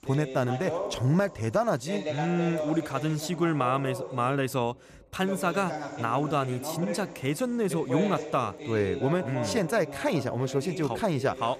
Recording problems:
voice in the background; loud; throughout; 8 dB below the speech

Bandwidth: 14.5 kHz